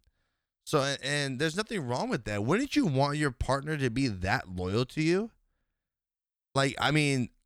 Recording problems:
none

